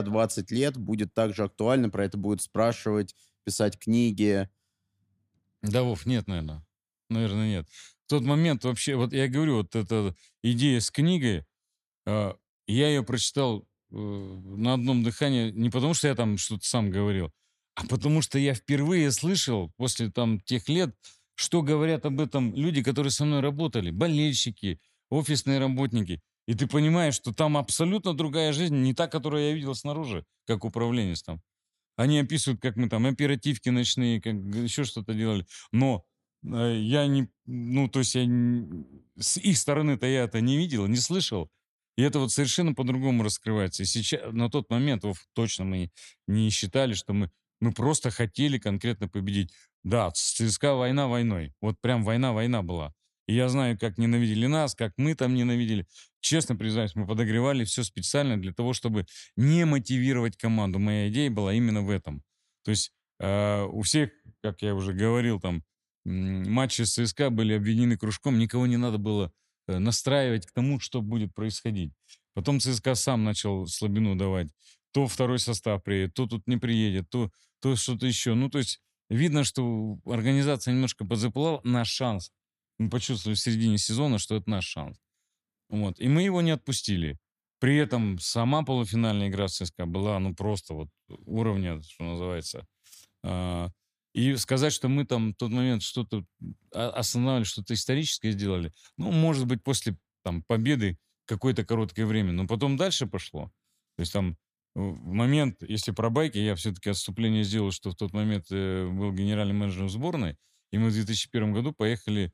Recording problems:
abrupt cut into speech; at the start

